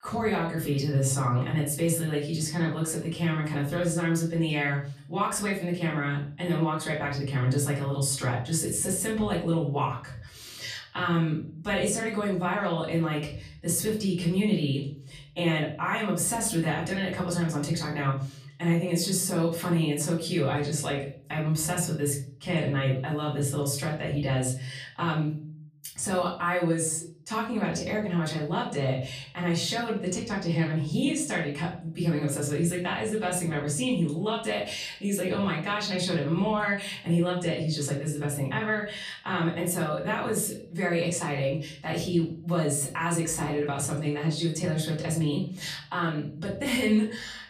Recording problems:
off-mic speech; far
room echo; slight; dies away in 0.5 s

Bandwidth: 15 kHz